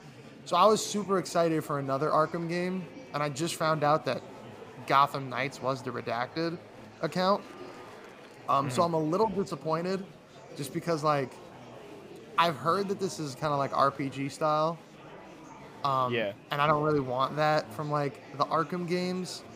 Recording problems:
murmuring crowd; noticeable; throughout; 20 dB below the speech

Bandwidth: 15.5 kHz